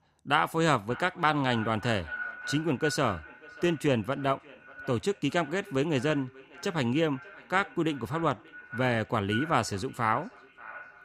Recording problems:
echo of what is said; noticeable; throughout; 590 ms later, 15 dB below the speech

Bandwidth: 15.5 kHz